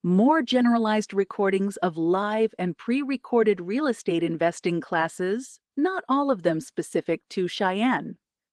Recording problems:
garbled, watery; slightly

